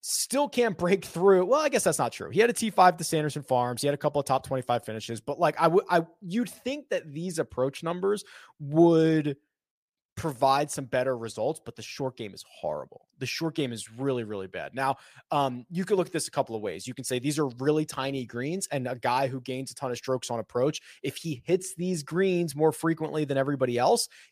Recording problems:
none

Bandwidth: 15 kHz